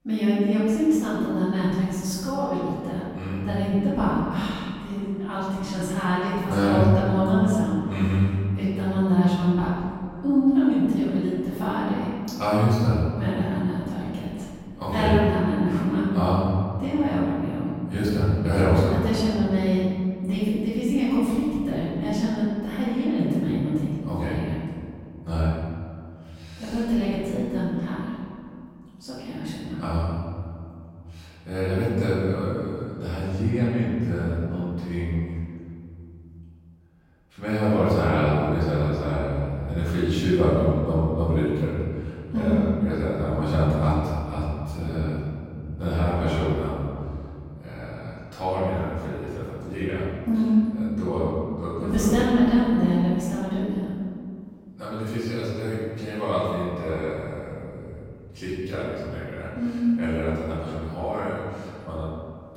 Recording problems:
room echo; strong; dies away in 2.2 s
off-mic speech; far

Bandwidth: 16 kHz